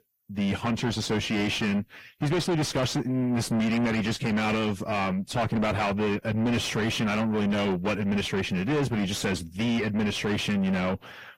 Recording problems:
distortion; heavy; 6 dB below the speech
garbled, watery; slightly; nothing above 16.5 kHz

